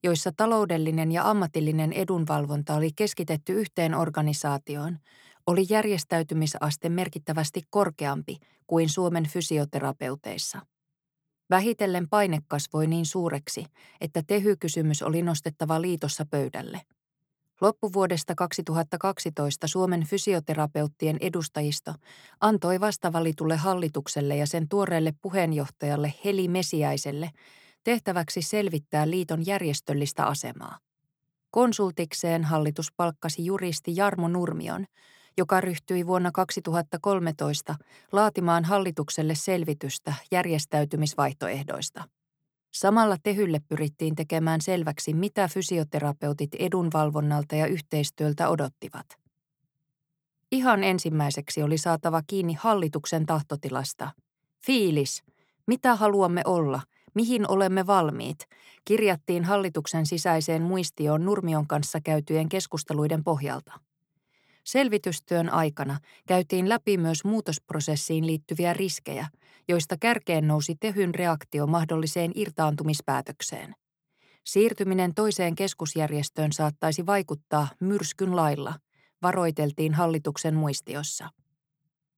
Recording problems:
none

